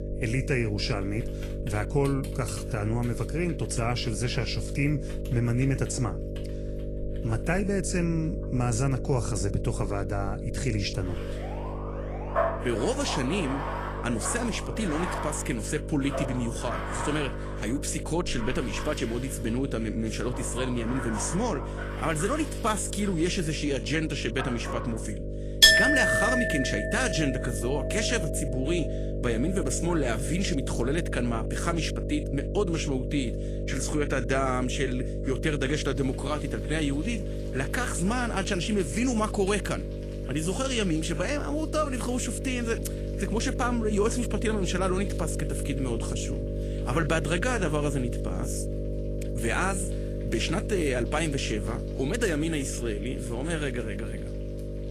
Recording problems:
garbled, watery; slightly
household noises; very loud; throughout; 1 dB above the speech
electrical hum; loud; throughout; 50 Hz, 8 dB below the speech
alarm; faint; from 11 to 15 s; peak 10 dB below the speech

